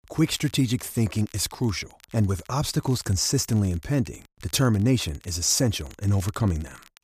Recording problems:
crackle, like an old record; faint; 25 dB below the speech

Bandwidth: 14.5 kHz